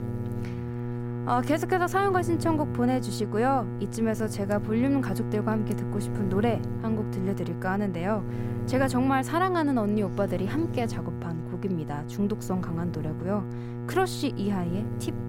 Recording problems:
electrical hum; noticeable; throughout; 60 Hz, 10 dB below the speech

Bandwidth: 16 kHz